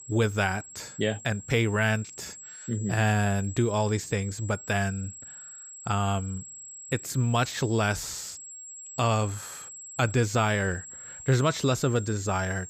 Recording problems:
high-pitched whine; noticeable; throughout; 7.5 kHz, 15 dB below the speech

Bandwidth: 15.5 kHz